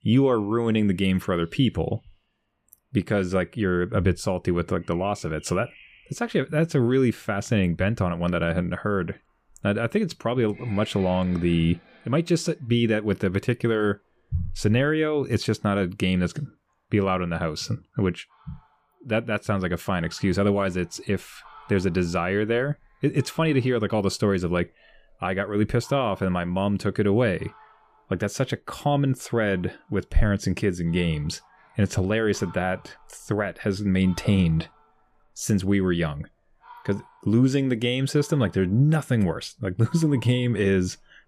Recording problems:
animal sounds; faint; throughout; 25 dB below the speech

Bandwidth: 15 kHz